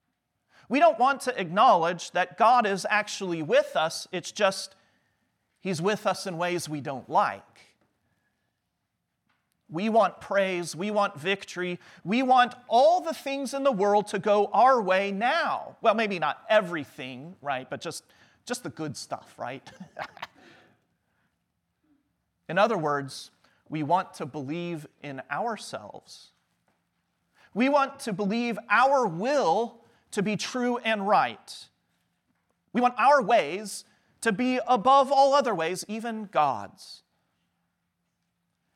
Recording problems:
uneven, jittery; strongly; from 27 to 36 s

